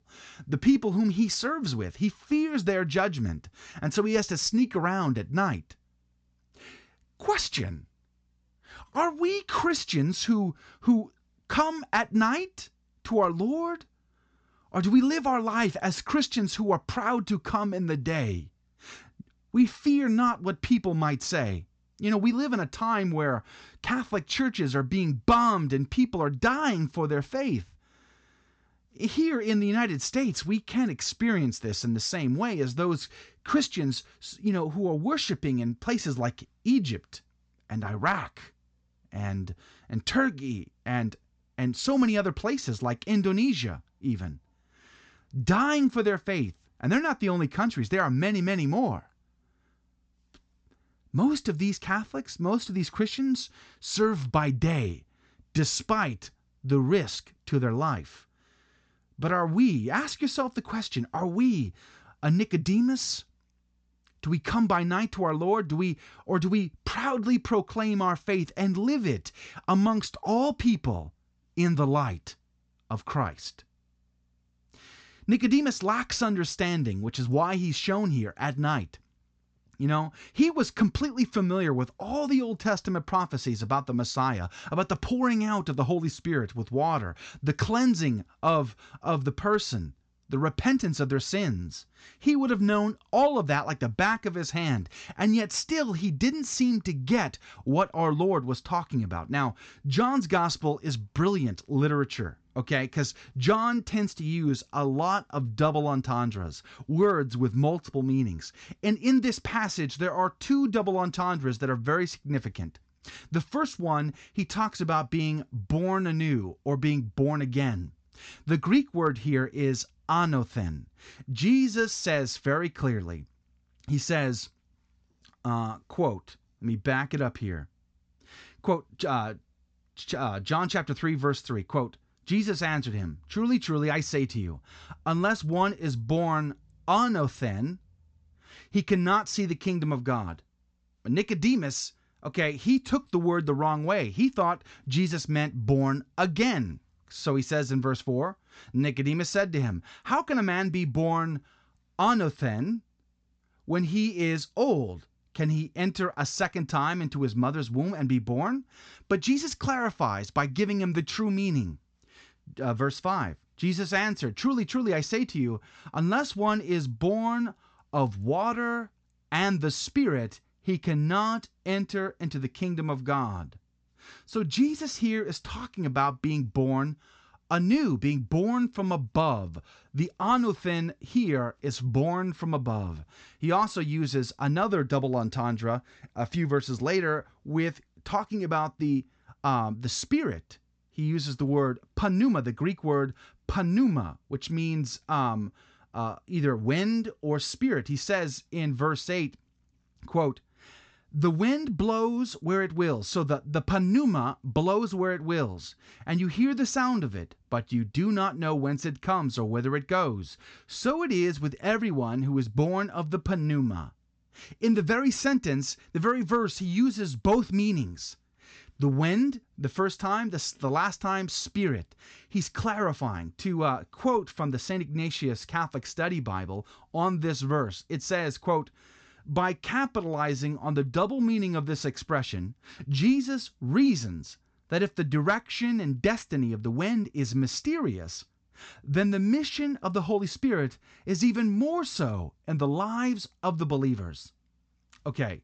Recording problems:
high frequencies cut off; noticeable; nothing above 8 kHz

